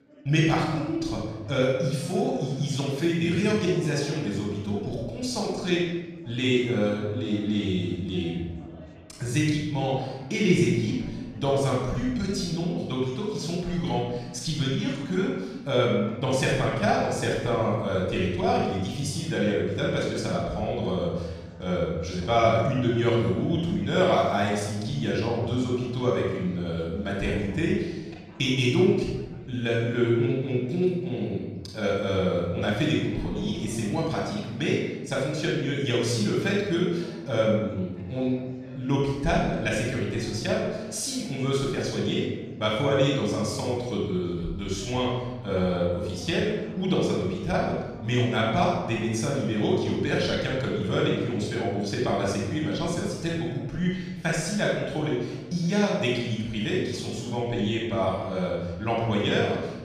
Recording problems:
room echo; strong; dies away in 1.1 s
off-mic speech; far
chatter from many people; faint; throughout; 25 dB below the speech

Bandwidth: 14 kHz